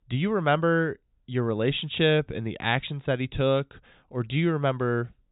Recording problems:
high frequencies cut off; severe; nothing above 4 kHz

